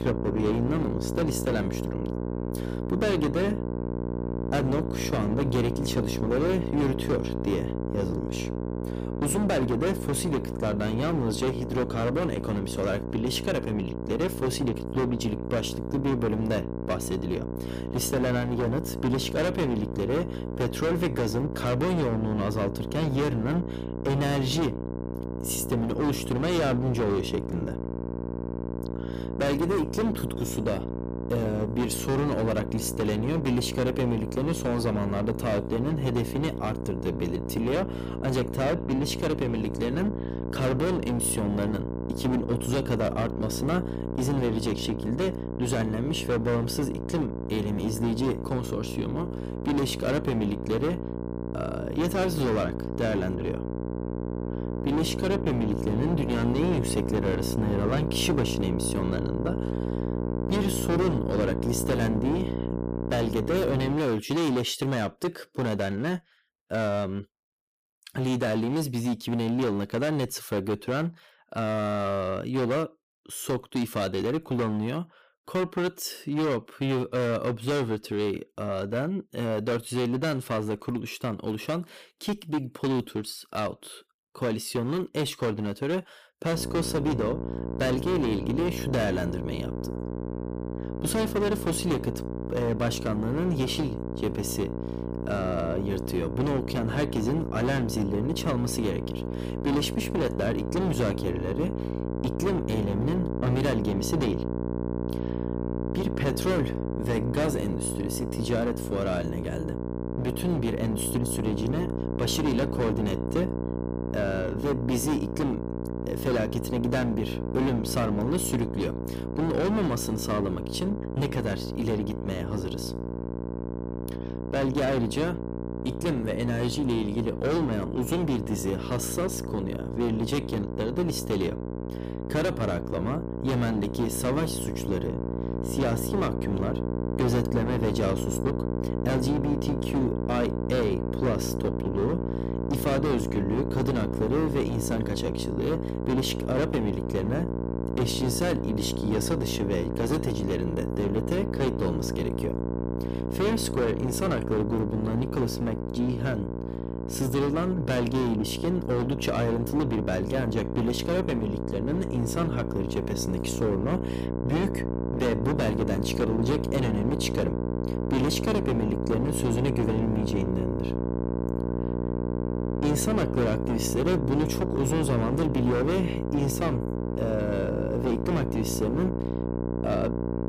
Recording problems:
distortion; heavy; 14% of the sound clipped
electrical hum; loud; until 1:04 and from 1:27 on; 60 Hz, 5 dB below the speech

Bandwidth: 15 kHz